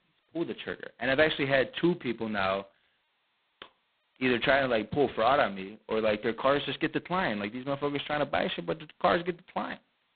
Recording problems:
phone-call audio; poor line; nothing above 4 kHz

